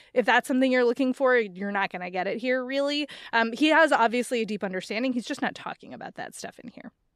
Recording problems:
none

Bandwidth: 14.5 kHz